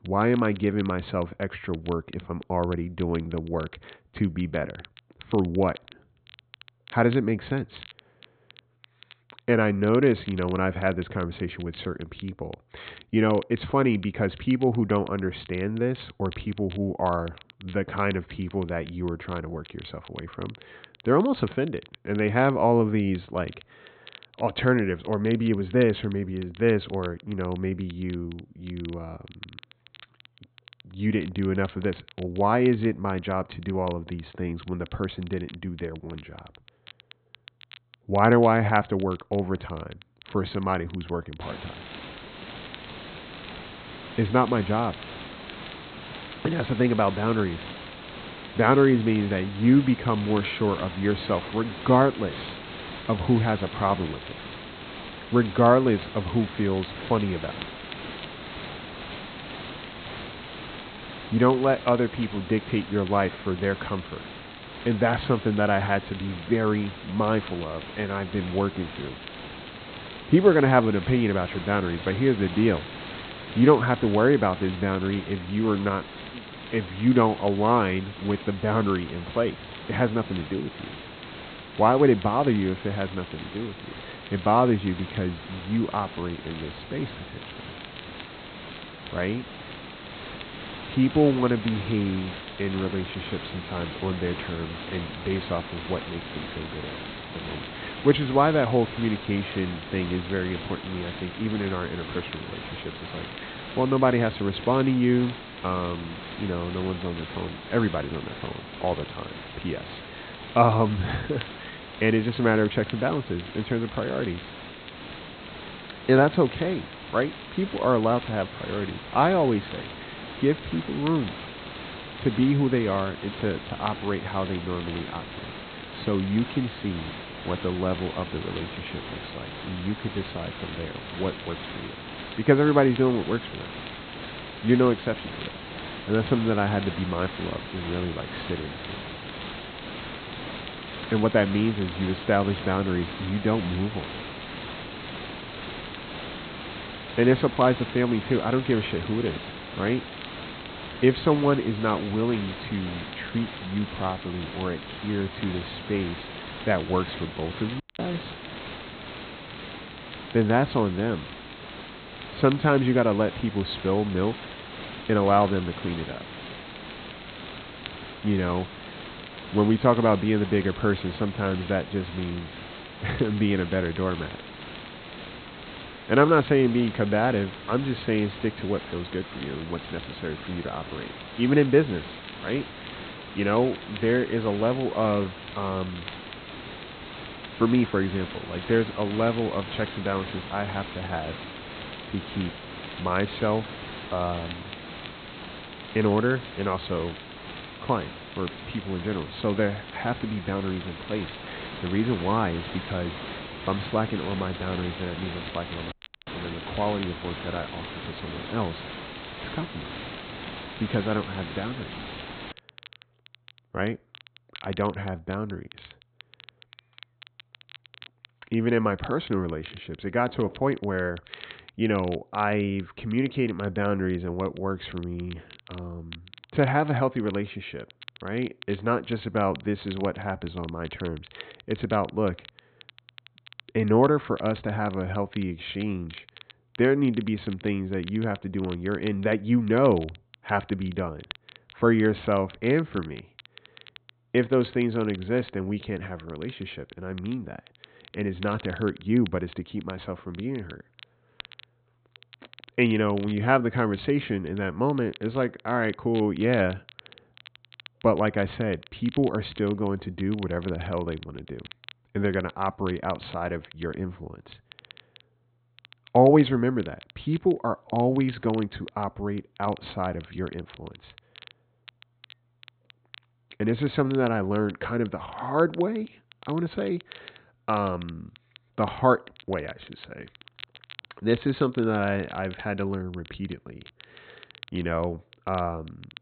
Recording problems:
high frequencies cut off; severe; nothing above 4 kHz
hiss; noticeable; from 41 s to 3:33; 10 dB below the speech
crackle, like an old record; faint; 20 dB below the speech
audio cutting out; at 2:38 and at 3:26

